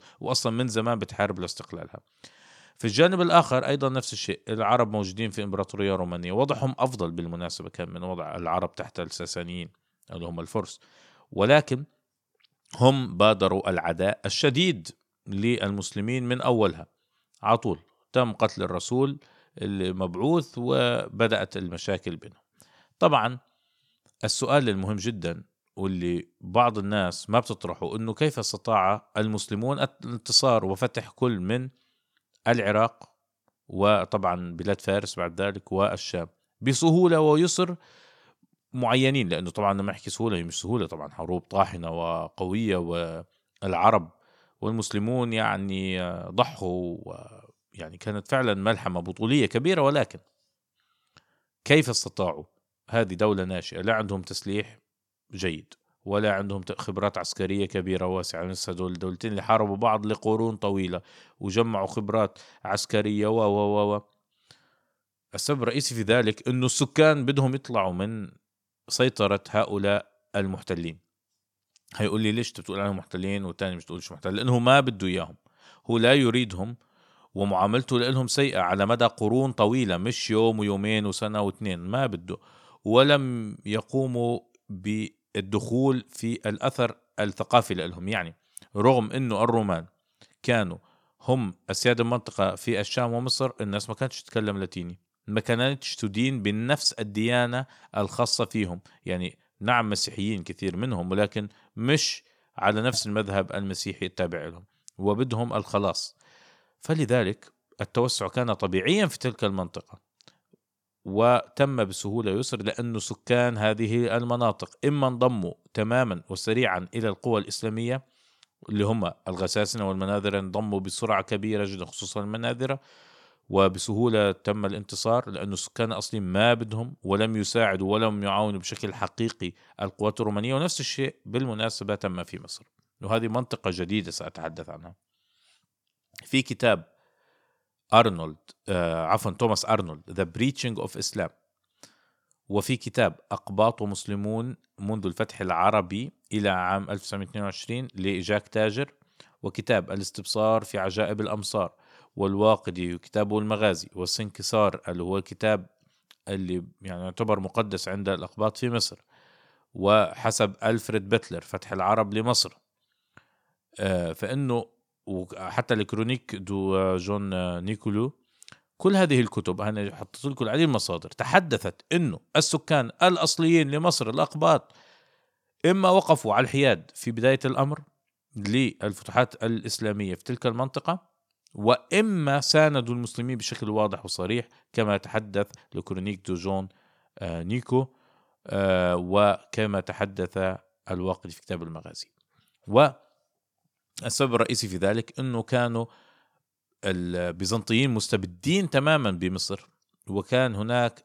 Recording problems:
none

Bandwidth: 17 kHz